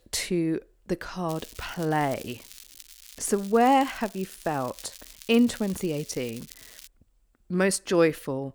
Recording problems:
crackling; noticeable; from 1.5 to 7 s; 20 dB below the speech

